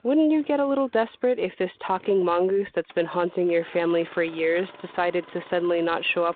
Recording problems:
phone-call audio; nothing above 4 kHz
traffic noise; faint; throughout; 25 dB below the speech

